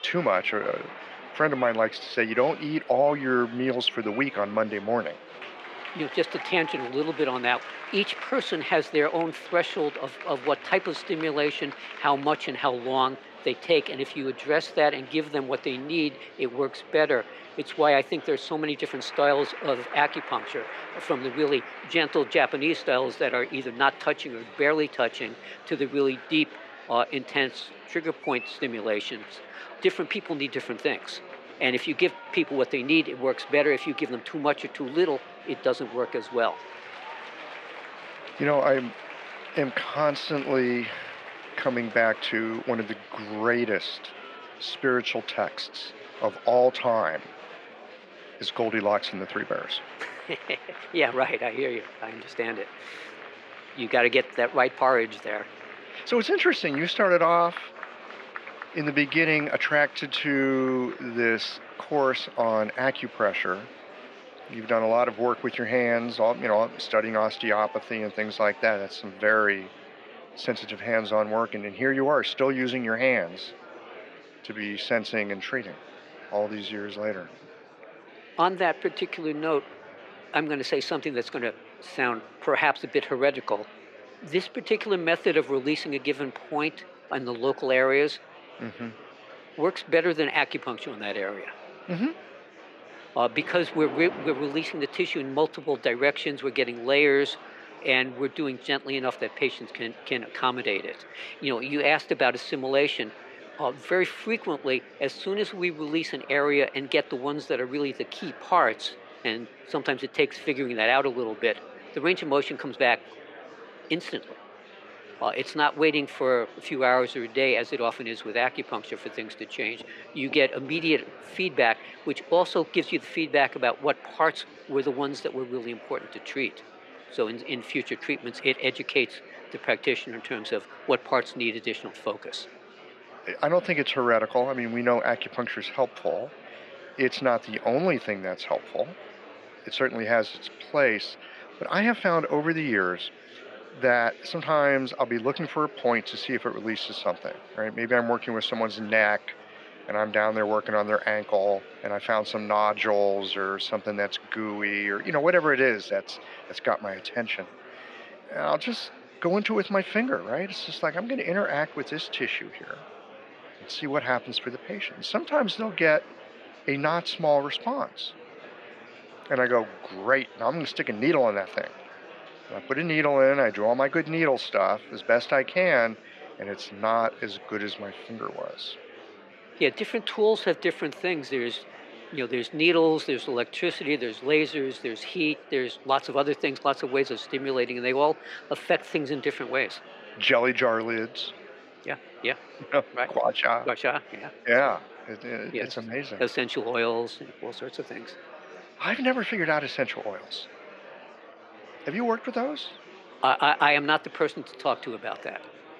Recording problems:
thin; somewhat; fading below 450 Hz
muffled; very slightly; fading above 2.5 kHz
murmuring crowd; noticeable; throughout; 20 dB below the speech
rain or running water; faint; throughout; 25 dB below the speech

